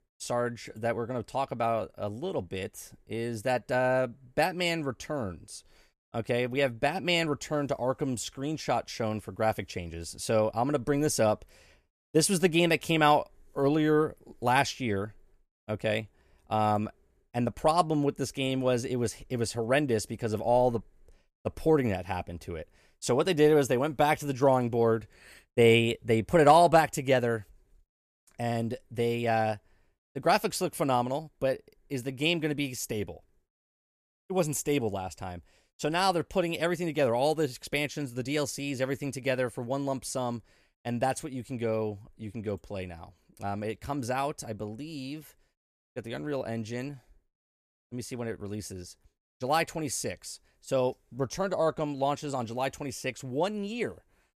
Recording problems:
none

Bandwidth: 14.5 kHz